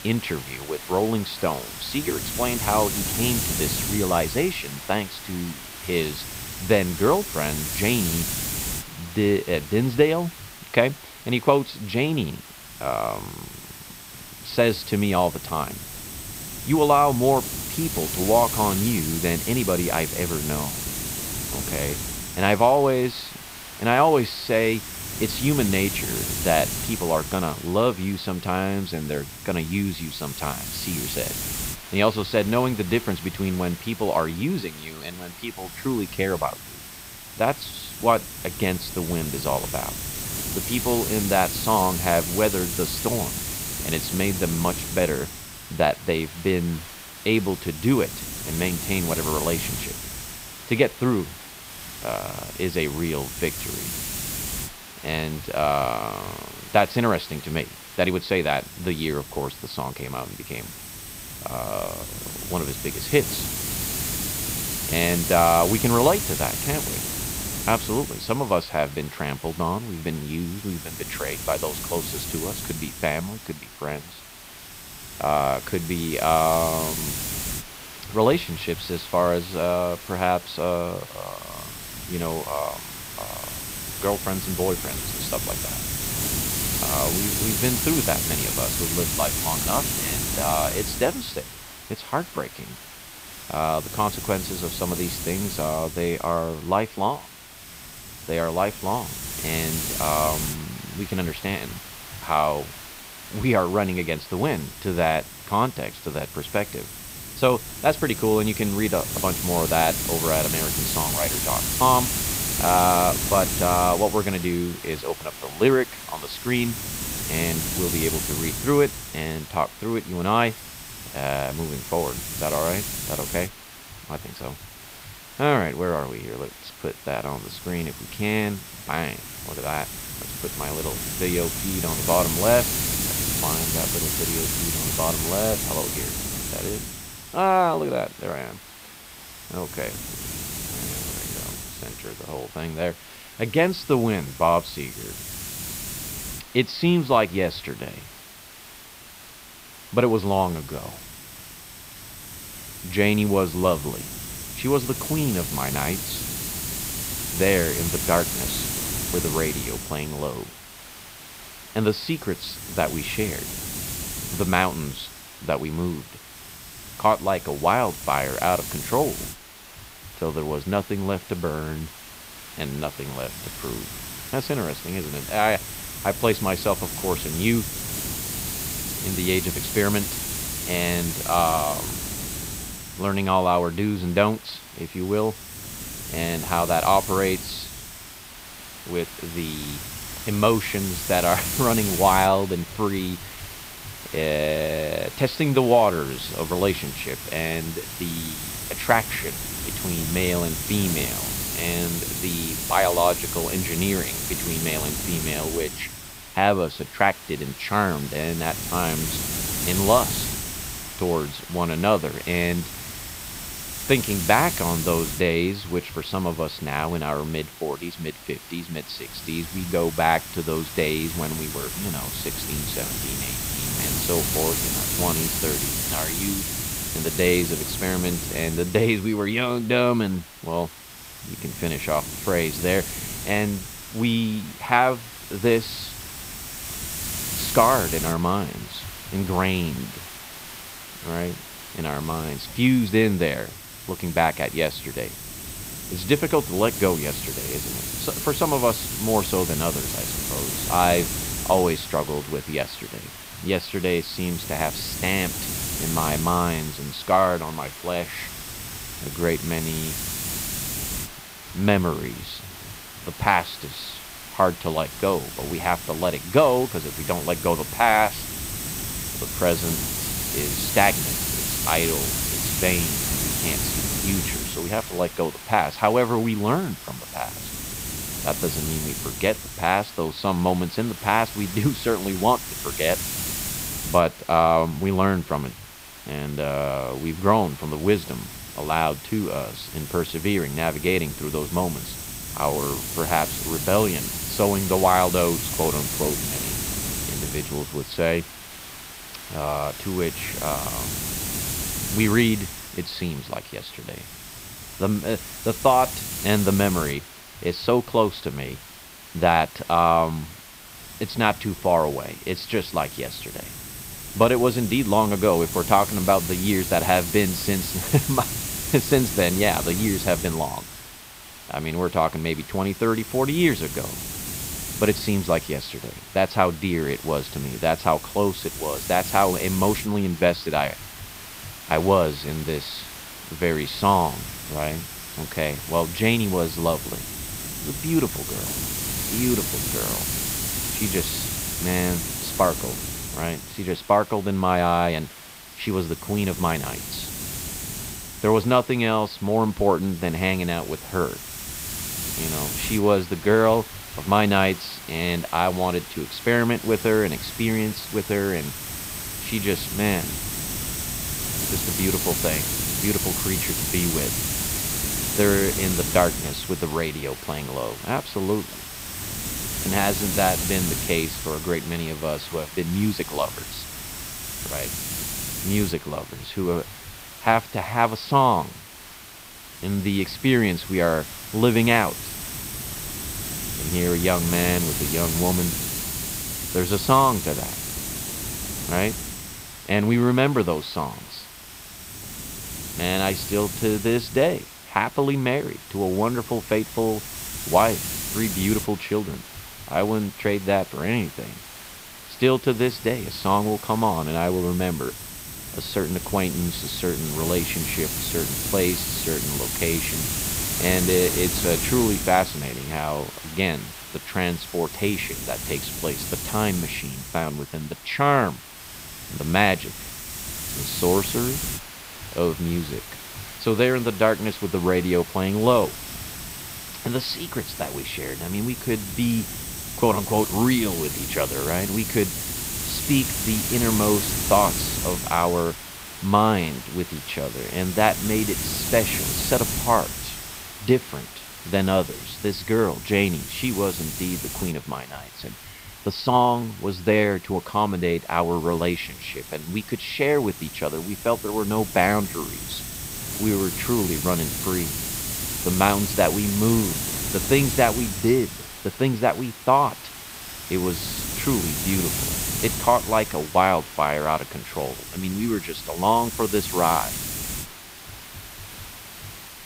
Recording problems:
high frequencies cut off; noticeable; nothing above 5.5 kHz
hiss; loud; throughout; 5 dB below the speech

